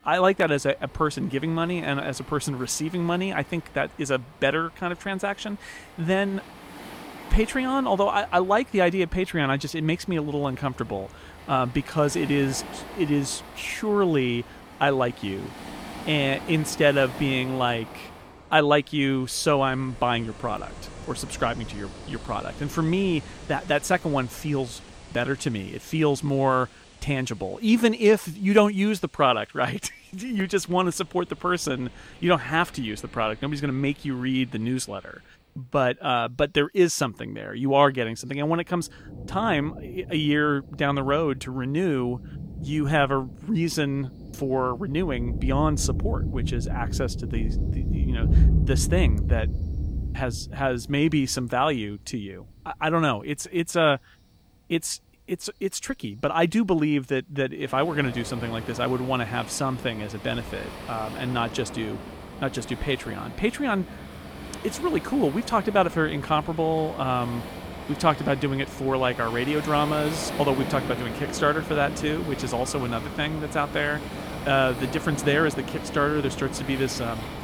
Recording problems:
rain or running water; loud; throughout; 9 dB below the speech

